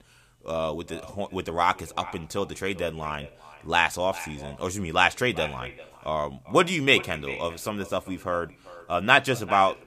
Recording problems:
echo of what is said; noticeable; throughout; 390 ms later, 15 dB below the speech

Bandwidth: 15 kHz